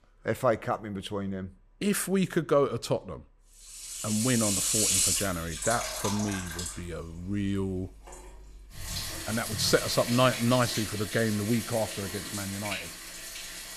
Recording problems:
household noises; loud; from 4.5 s on; 1 dB below the speech

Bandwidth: 14.5 kHz